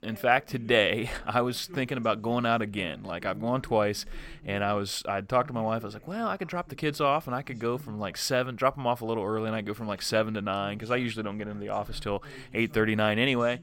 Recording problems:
voice in the background; faint; throughout; 20 dB below the speech

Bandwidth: 16.5 kHz